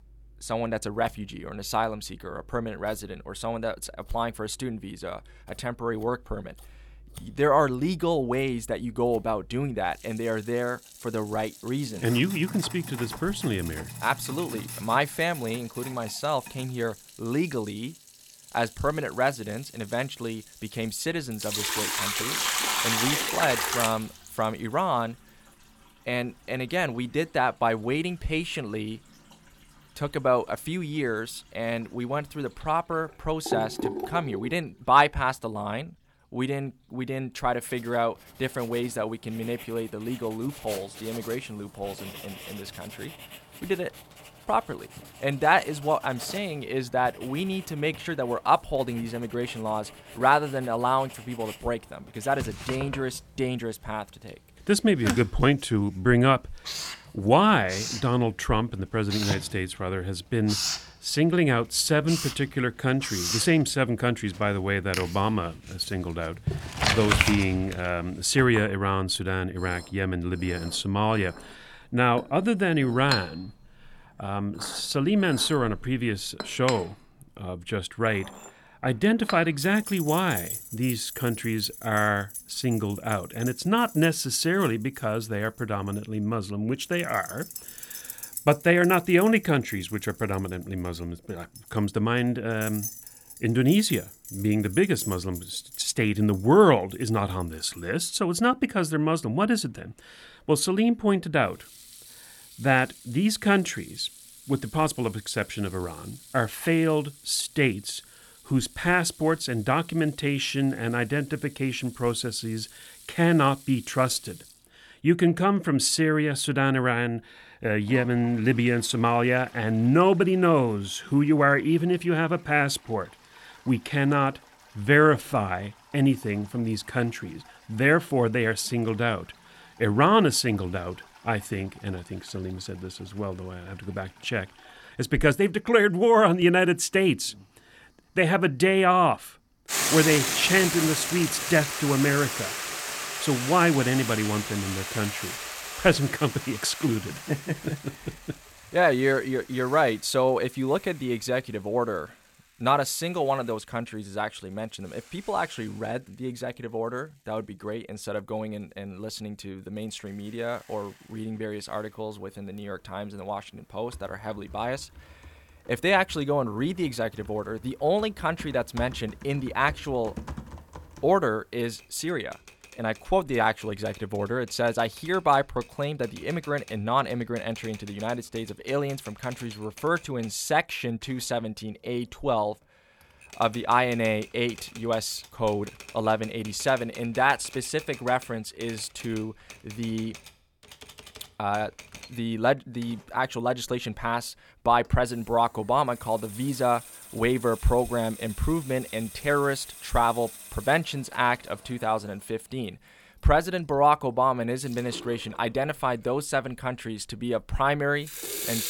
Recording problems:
household noises; loud; throughout; 9 dB below the speech

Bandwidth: 17 kHz